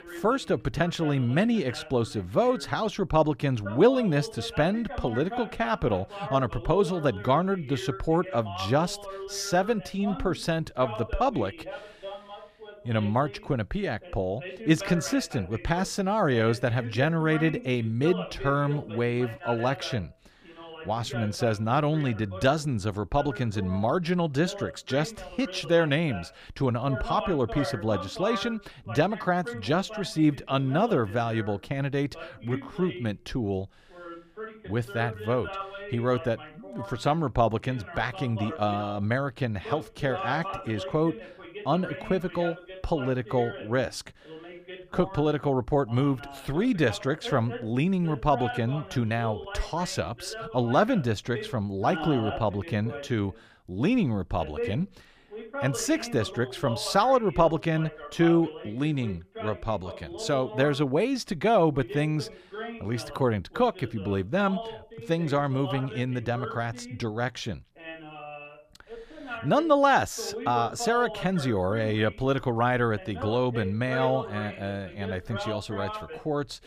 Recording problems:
voice in the background; noticeable; throughout; 10 dB below the speech

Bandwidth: 15 kHz